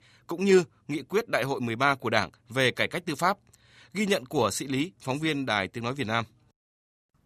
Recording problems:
none

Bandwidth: 14.5 kHz